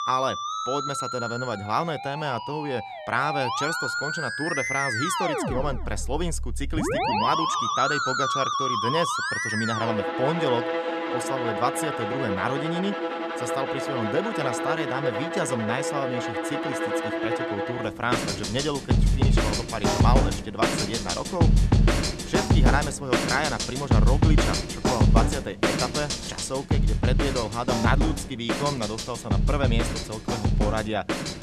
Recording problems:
background music; very loud; throughout; 3 dB above the speech

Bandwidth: 14 kHz